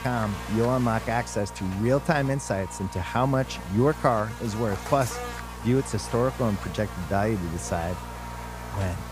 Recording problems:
electrical hum; loud; throughout; 60 Hz, 9 dB below the speech

